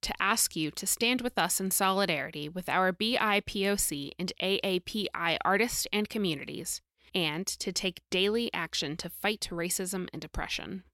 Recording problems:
none

